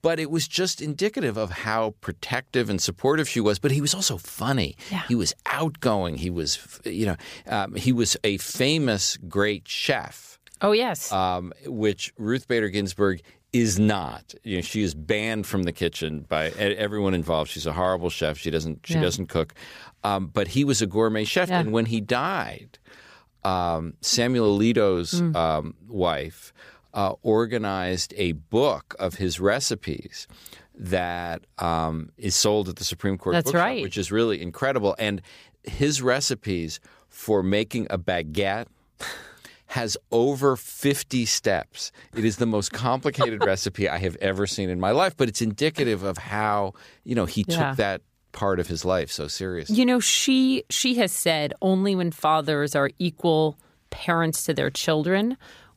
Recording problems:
none

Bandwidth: 15 kHz